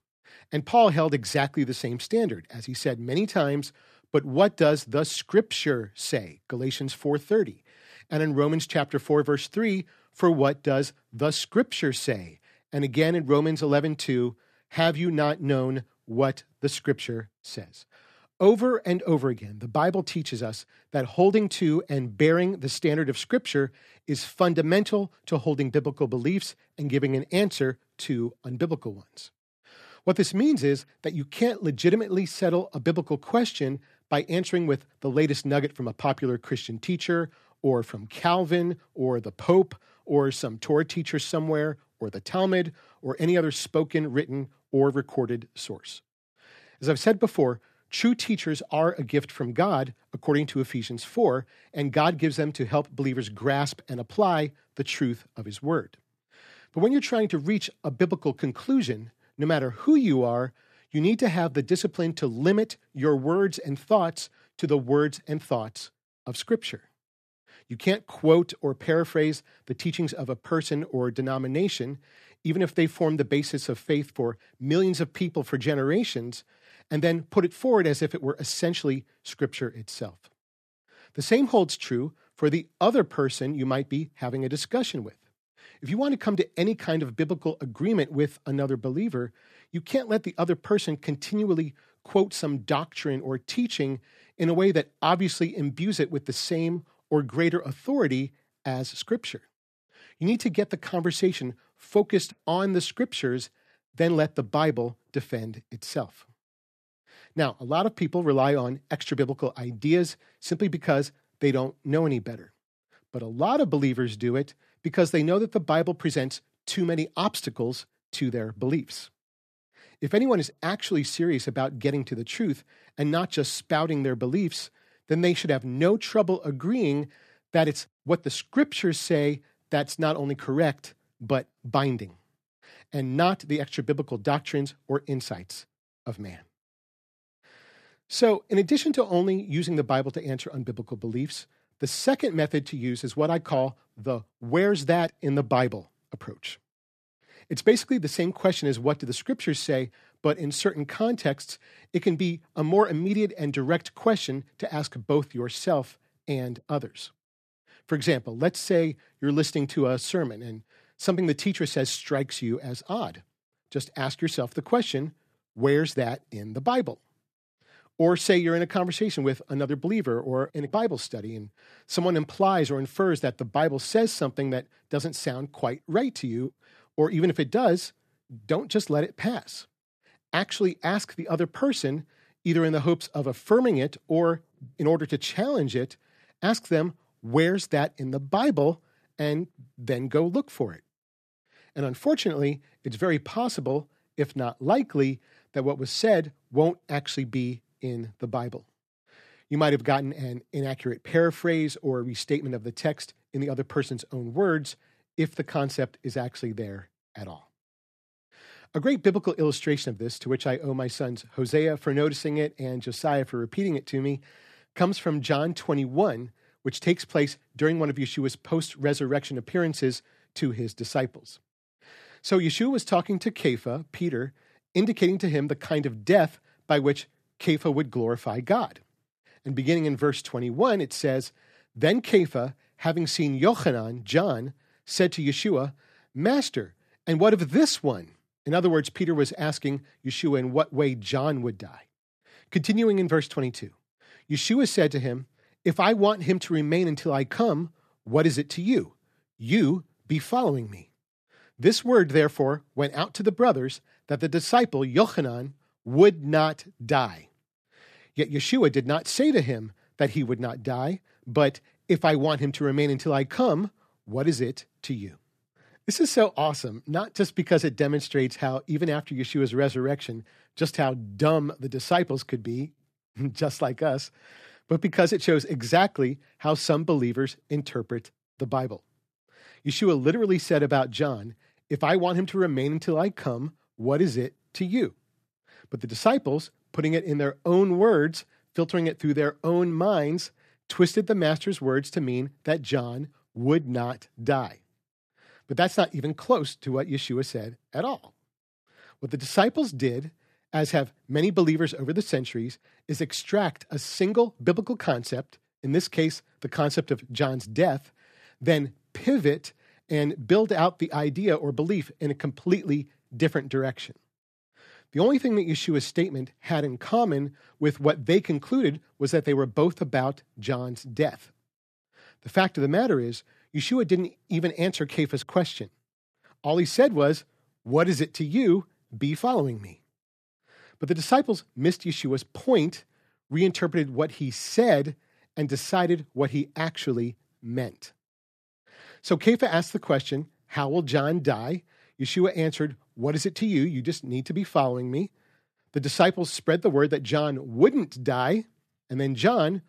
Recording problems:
none

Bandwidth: 14.5 kHz